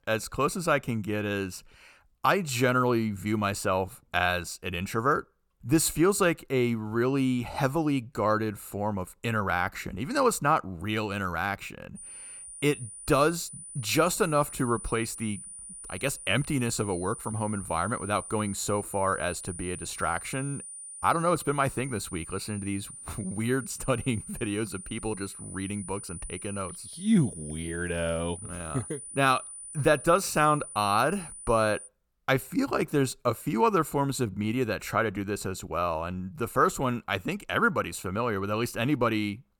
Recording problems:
high-pitched whine; noticeable; from 12 to 32 s; 9.5 kHz, 10 dB below the speech

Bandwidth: 18 kHz